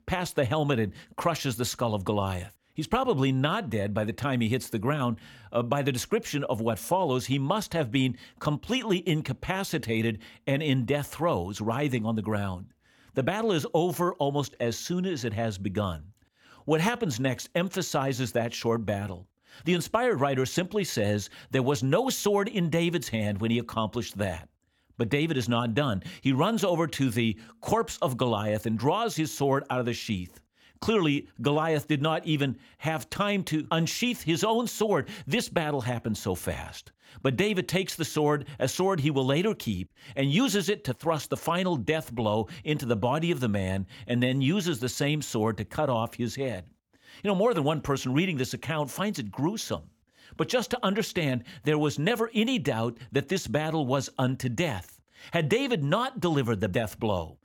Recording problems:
none

